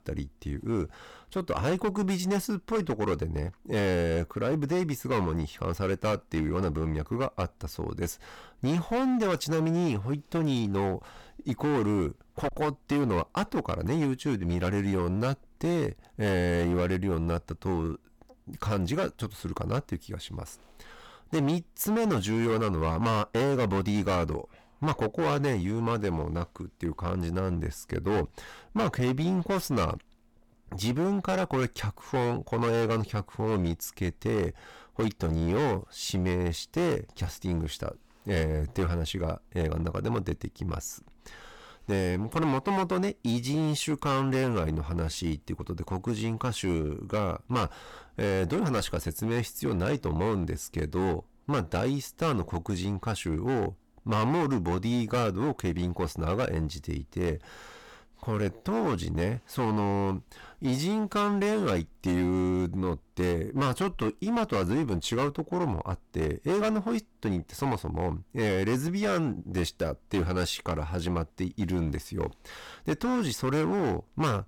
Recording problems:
distortion; heavy; 13% of the sound clipped

